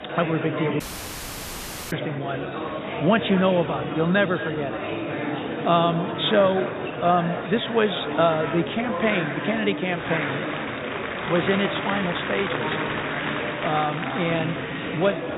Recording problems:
high frequencies cut off; severe; nothing above 4 kHz
echo of what is said; noticeable; throughout; 230 ms later, 15 dB below the speech
murmuring crowd; loud; throughout; 4 dB below the speech
audio cutting out; at 1 s for 1 s

